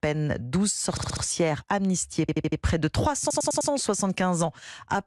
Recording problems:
audio stuttering; at 1 s, at 2 s and at 3 s

